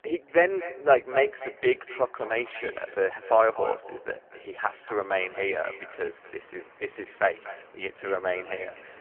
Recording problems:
phone-call audio; poor line
echo of what is said; noticeable; throughout; 240 ms later, 15 dB below the speech
traffic noise; faint; throughout; 25 dB below the speech
choppy; occasionally; 1% of the speech affected

